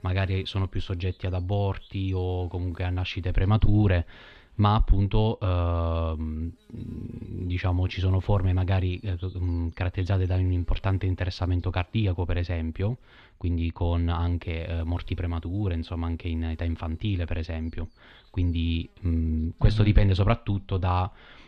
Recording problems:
muffled; slightly; fading above 3.5 kHz
electrical hum; faint; throughout; 50 Hz, 30 dB below the speech

